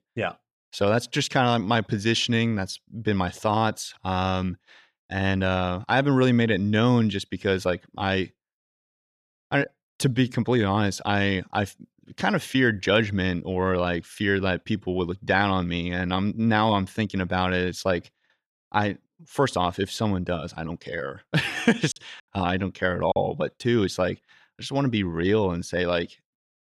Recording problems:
choppy; occasionally; from 22 to 23 s; 2% of the speech affected

